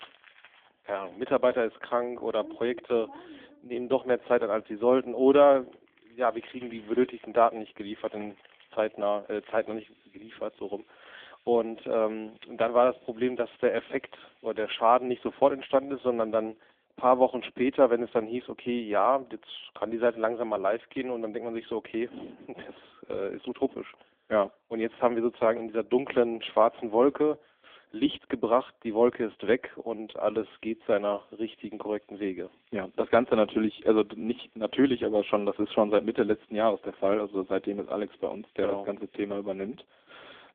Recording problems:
phone-call audio; poor line; nothing above 3.5 kHz
household noises; faint; throughout; 30 dB below the speech

